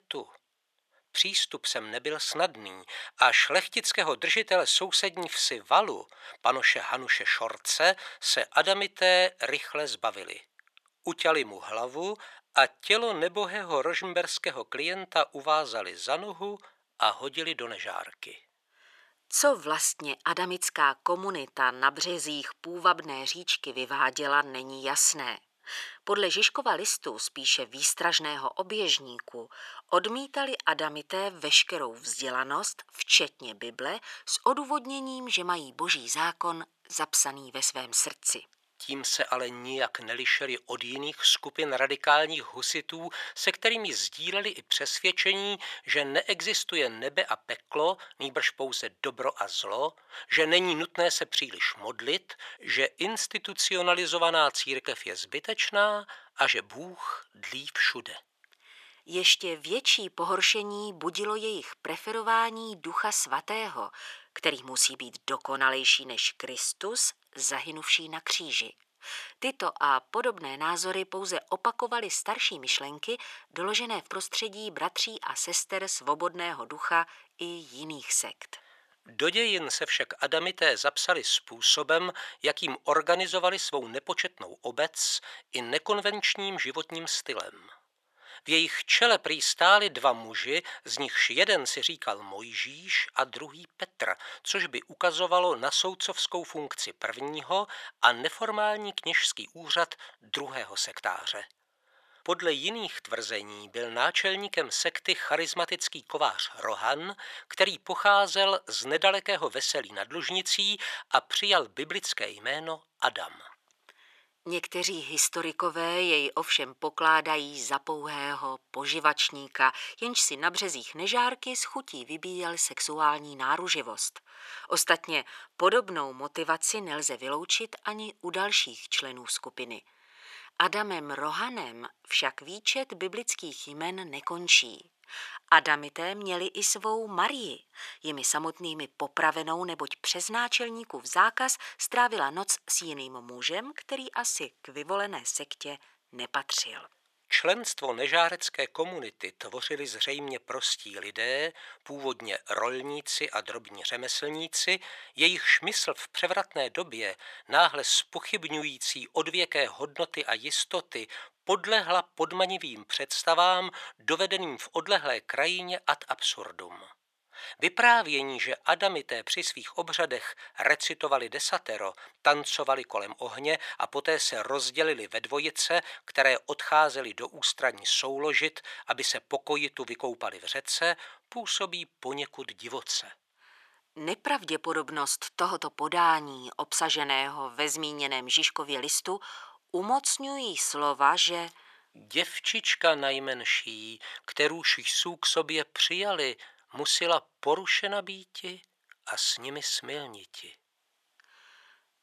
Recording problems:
thin; very; fading below 850 Hz

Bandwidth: 14 kHz